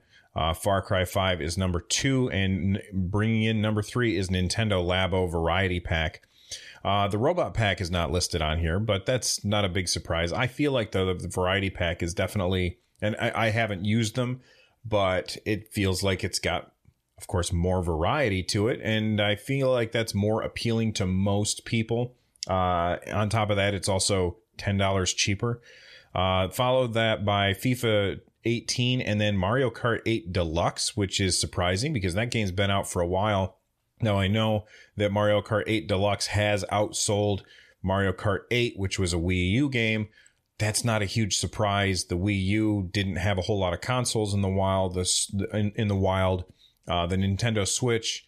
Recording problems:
none

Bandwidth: 14.5 kHz